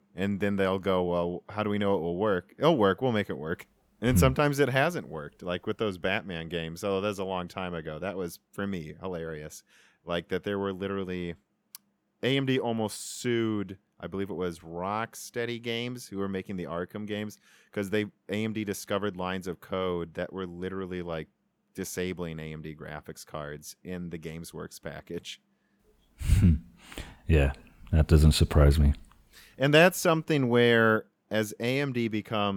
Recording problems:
abrupt cut into speech; at the end

